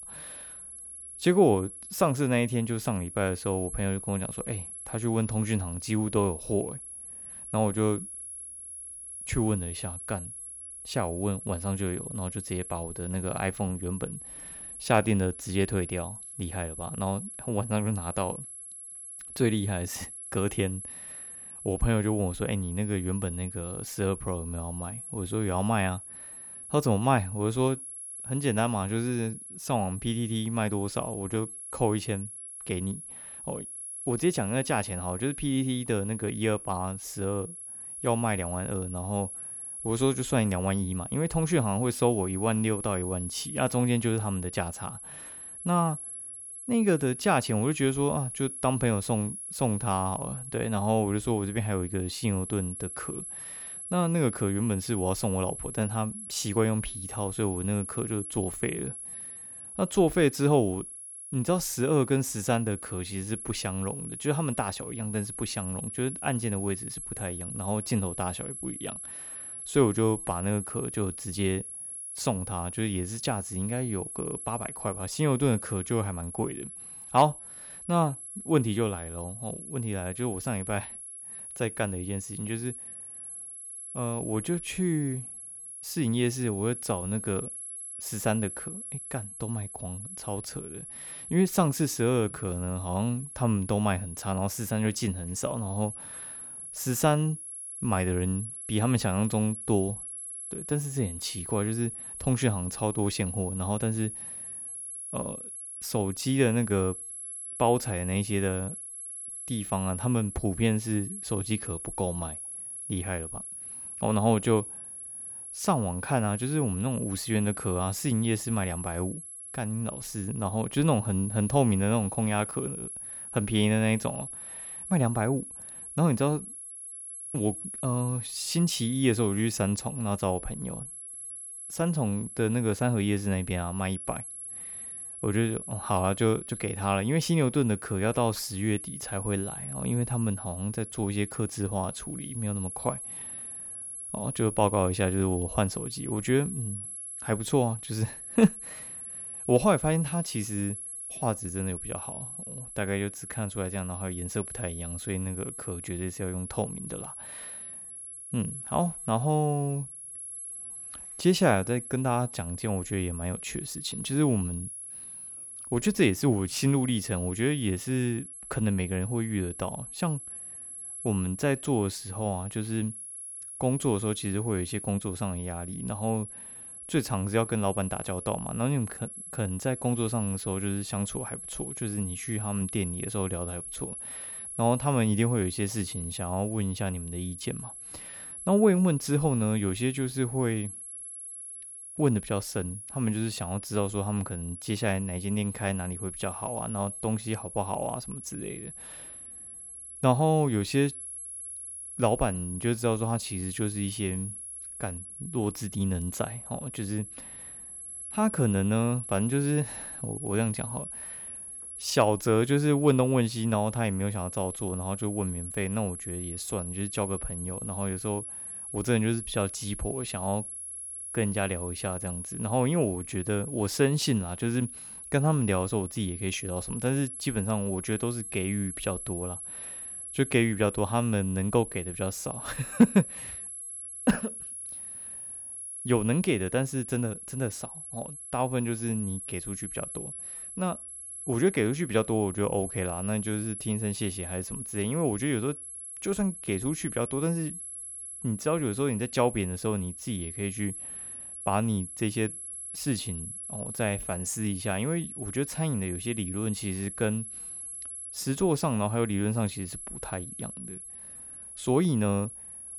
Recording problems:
high-pitched whine; loud; throughout; 11 kHz, 8 dB below the speech

